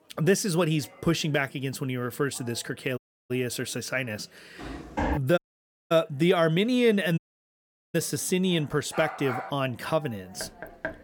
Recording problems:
background chatter; faint; throughout; 4 voices, 25 dB below the speech
audio cutting out; at 3 s, at 5.5 s for 0.5 s and at 7 s for 1 s
footsteps; noticeable; at 4.5 s; peak 3 dB below the speech
dog barking; noticeable; at 9 s; peak 7 dB below the speech
door banging; faint; at 10 s; peak 10 dB below the speech

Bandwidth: 17 kHz